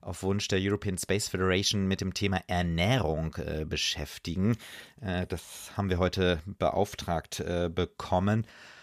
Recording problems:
none

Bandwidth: 14.5 kHz